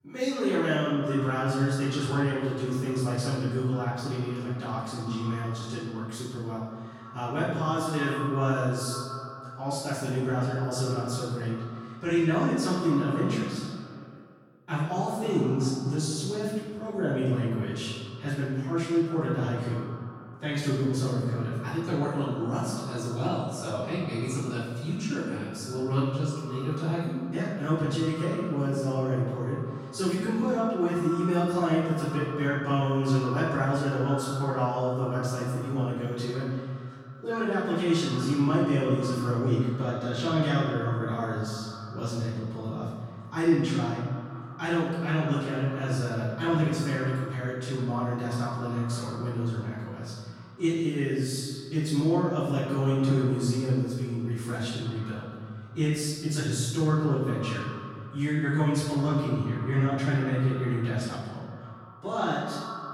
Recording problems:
room echo; strong; dies away in 1.2 s
off-mic speech; far
echo of what is said; noticeable; throughout; 160 ms later, 15 dB below the speech

